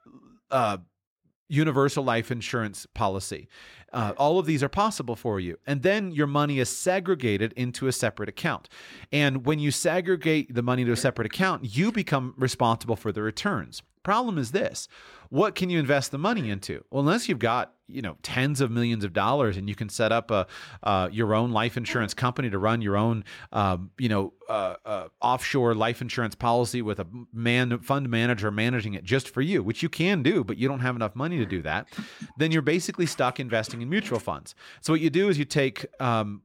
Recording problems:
none

